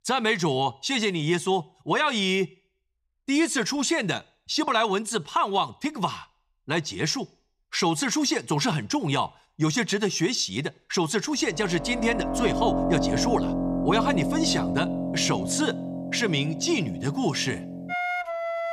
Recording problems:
background music; loud; from 12 s on; 3 dB below the speech

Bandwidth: 14.5 kHz